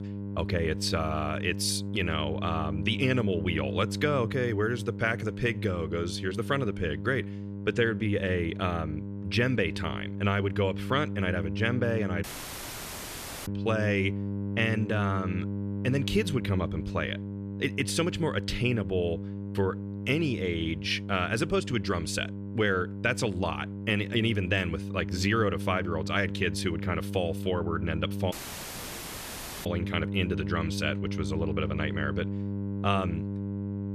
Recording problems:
electrical hum; noticeable; throughout; 50 Hz, 10 dB below the speech
audio cutting out; at 12 s for 1 s and at 28 s for 1.5 s

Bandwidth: 14.5 kHz